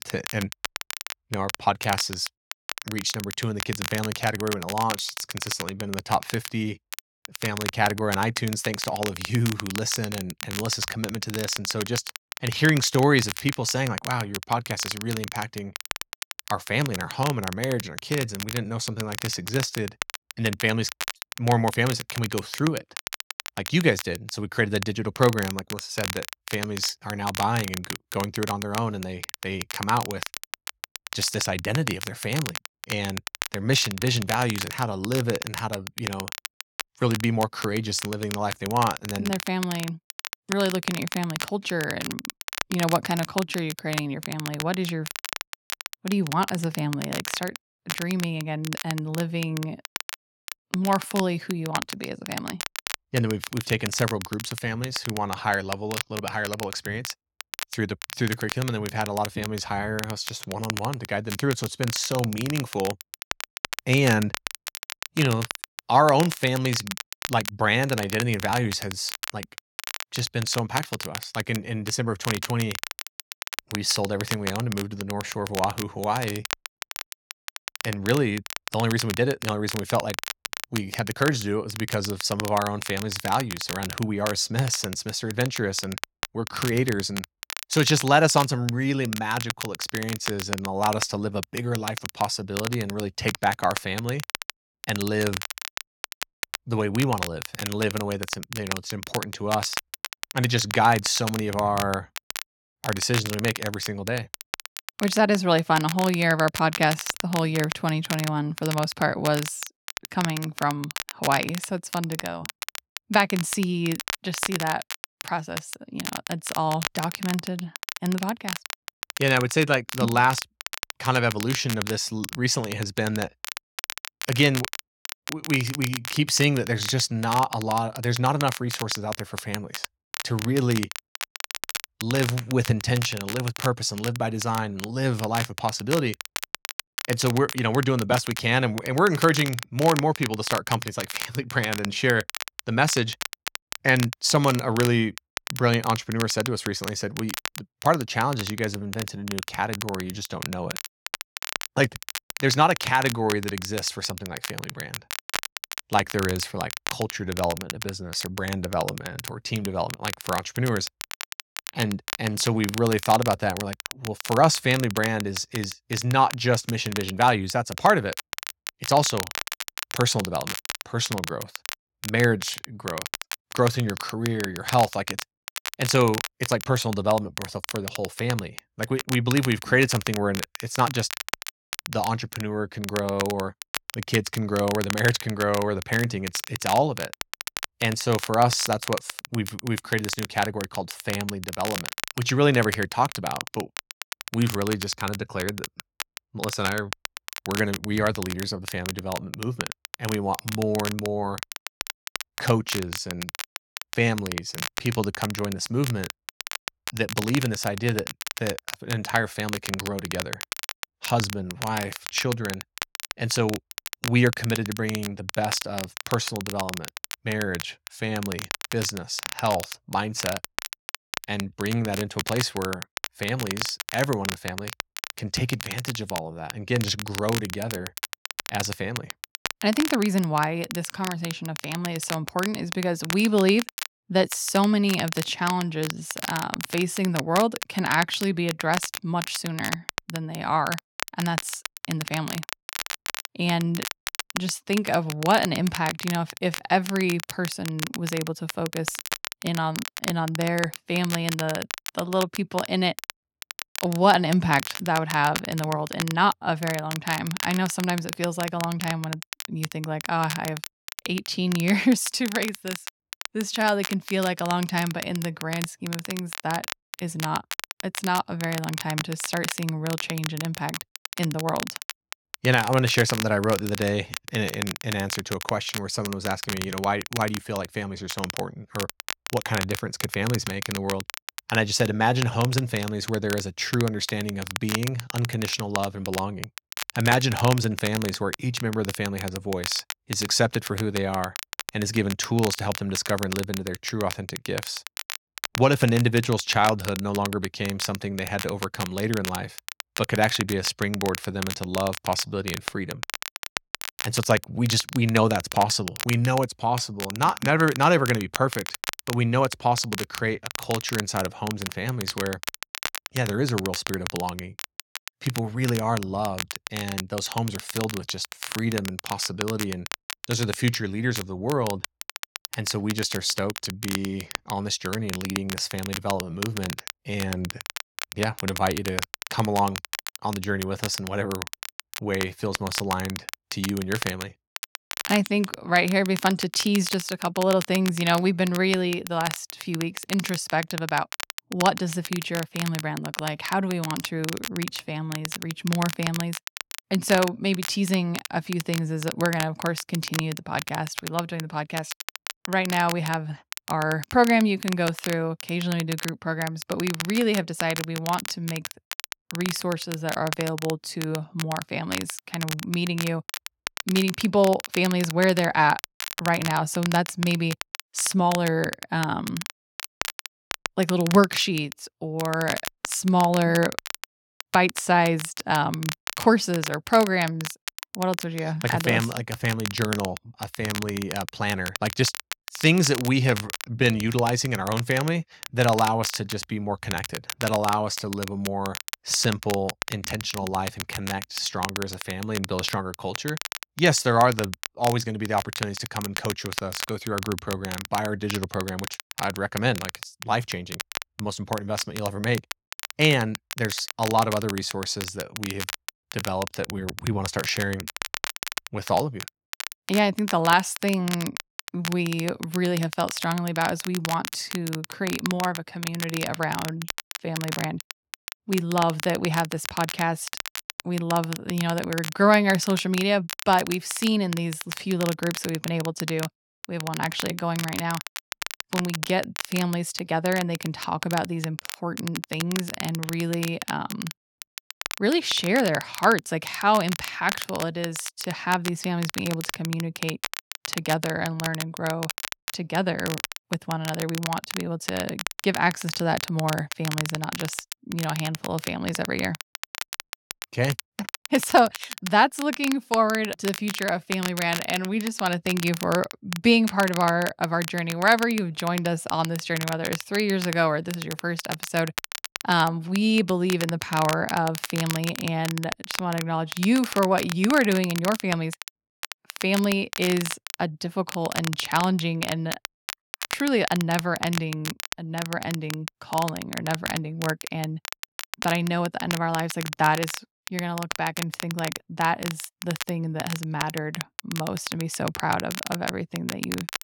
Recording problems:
crackle, like an old record; loud; 8 dB below the speech

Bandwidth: 17 kHz